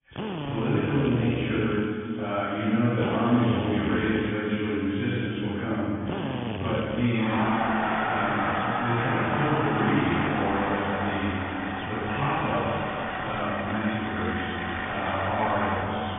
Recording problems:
room echo; strong; dies away in 2 s
off-mic speech; far
garbled, watery; badly
high frequencies cut off; severe; nothing above 3.5 kHz
machinery noise; loud; throughout; 3 dB below the speech

